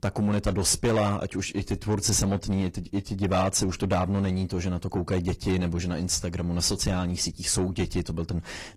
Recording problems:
distortion; slight; 10 dB below the speech
garbled, watery; slightly; nothing above 14.5 kHz

